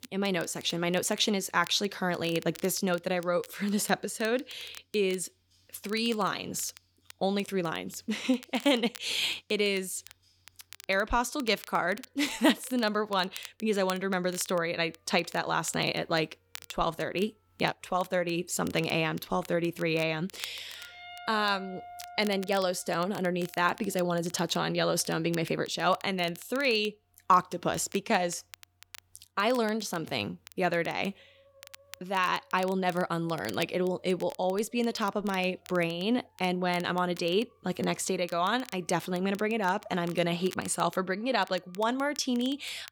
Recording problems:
background music; faint; throughout; 25 dB below the speech
crackle, like an old record; faint; 20 dB below the speech

